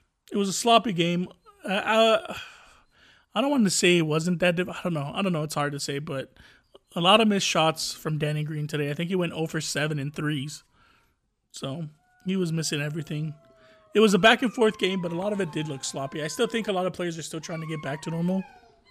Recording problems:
animal sounds; faint; throughout; 25 dB below the speech

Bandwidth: 14.5 kHz